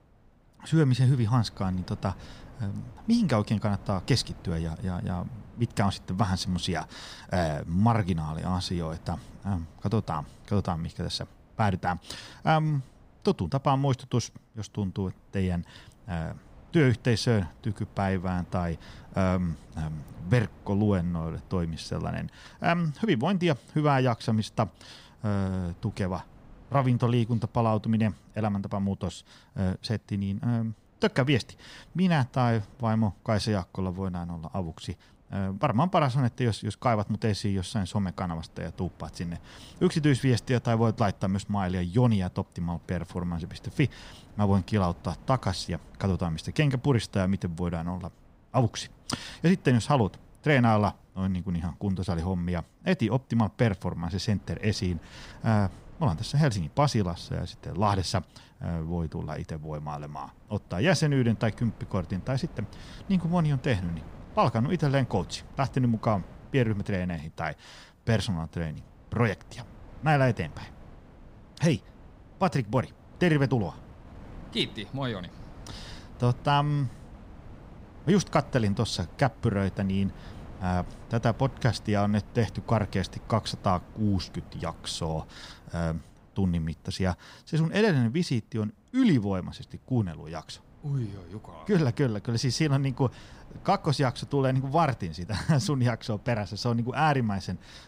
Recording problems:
wind noise on the microphone; occasional gusts; 25 dB below the speech

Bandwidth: 15.5 kHz